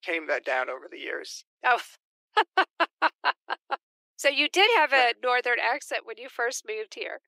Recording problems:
thin; very; fading below 350 Hz

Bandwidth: 15.5 kHz